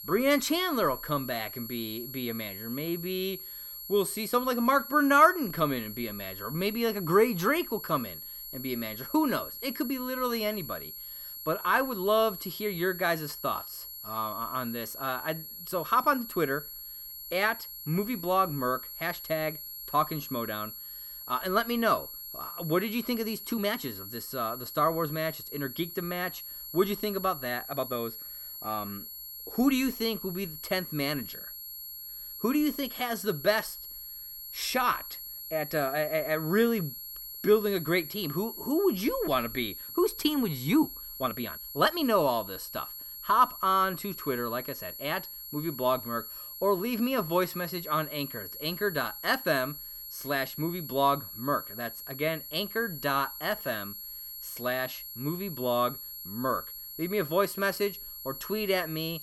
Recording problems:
high-pitched whine; loud; throughout; 11.5 kHz, 9 dB below the speech
uneven, jittery; strongly; from 24 to 42 s

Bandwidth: 17 kHz